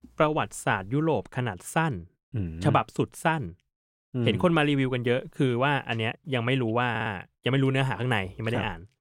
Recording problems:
audio stuttering; at 7 s

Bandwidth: 16 kHz